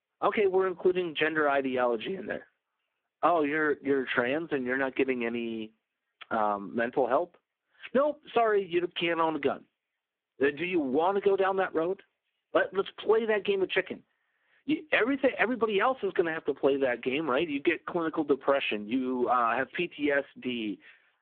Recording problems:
phone-call audio; poor line
squashed, flat; somewhat

